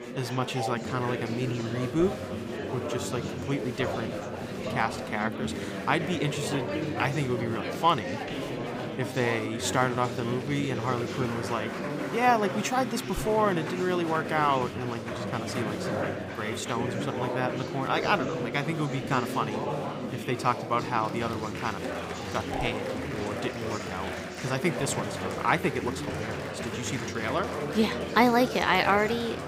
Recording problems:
chatter from many people; loud; throughout; 4 dB below the speech

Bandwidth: 15.5 kHz